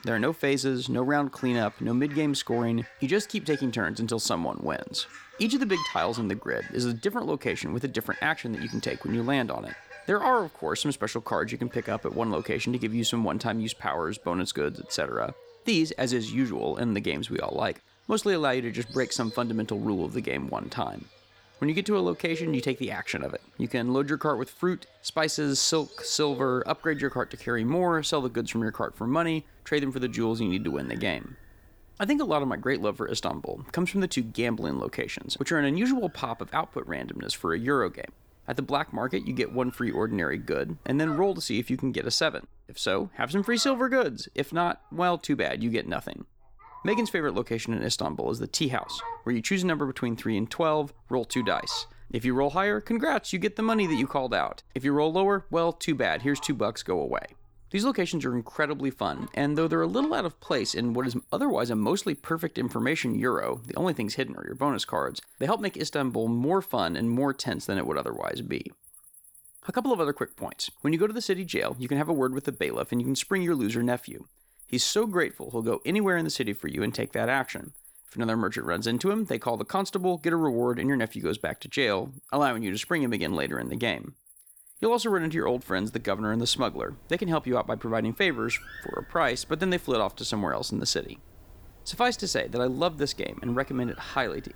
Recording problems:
animal sounds; noticeable; throughout; 20 dB below the speech

